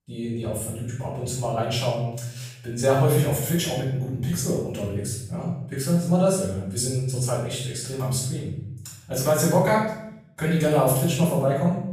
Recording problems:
off-mic speech; far
room echo; noticeable; dies away in 0.7 s

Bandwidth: 14.5 kHz